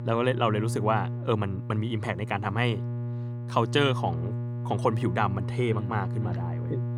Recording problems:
electrical hum; noticeable; throughout; 60 Hz, 15 dB below the speech

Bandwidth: 18.5 kHz